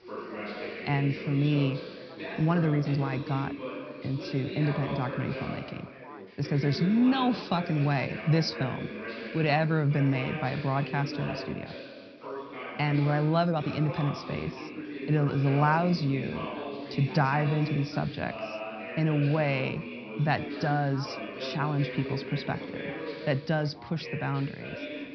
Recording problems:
high frequencies cut off; noticeable; nothing above 5.5 kHz
background chatter; loud; throughout; 3 voices, 9 dB below the speech
hiss; faint; throughout; 25 dB below the speech
uneven, jittery; strongly; from 2.5 to 18 s

